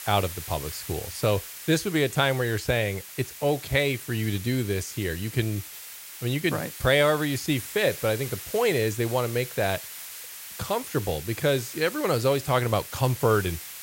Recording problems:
hiss; noticeable; throughout; 10 dB below the speech

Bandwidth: 16 kHz